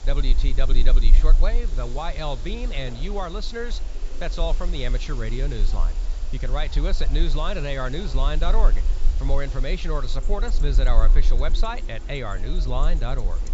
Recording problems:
high frequencies cut off; noticeable; nothing above 8 kHz
household noises; noticeable; throughout; 20 dB below the speech
chatter from many people; noticeable; throughout; 15 dB below the speech
hiss; noticeable; throughout; 20 dB below the speech
low rumble; faint; throughout; 20 dB below the speech

